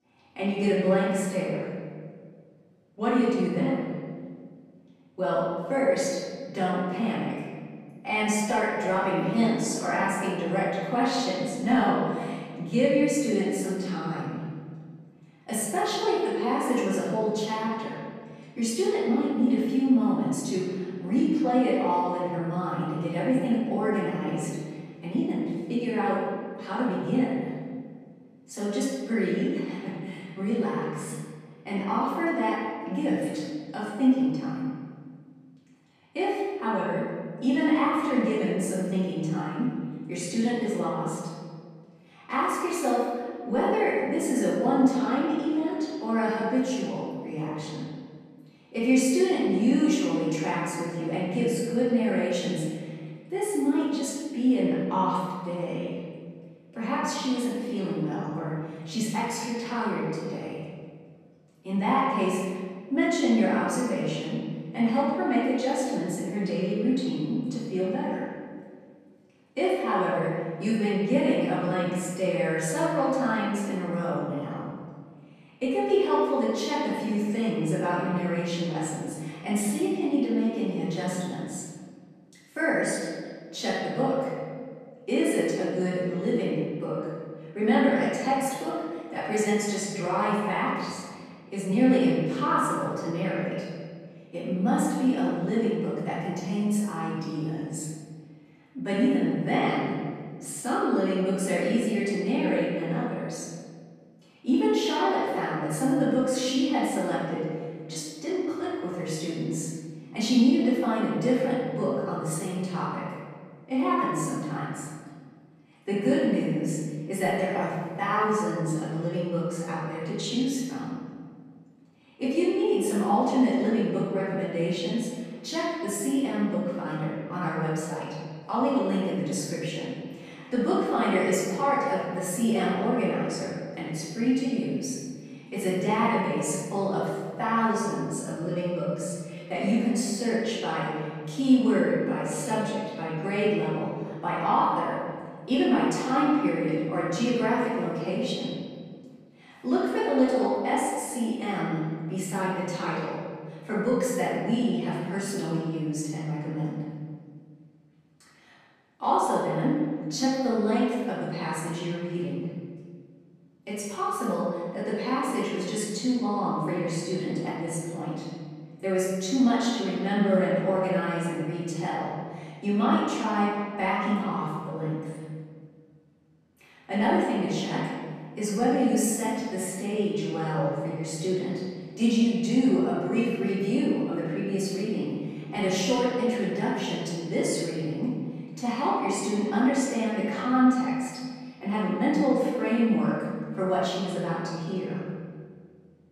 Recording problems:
room echo; strong; dies away in 1.6 s
off-mic speech; far

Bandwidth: 14.5 kHz